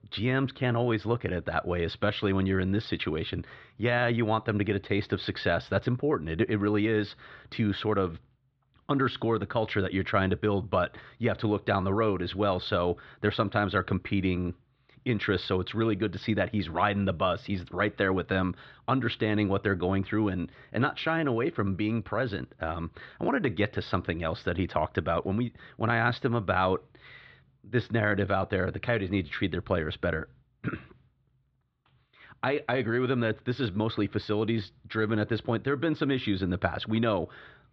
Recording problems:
muffled; slightly; fading above 4 kHz

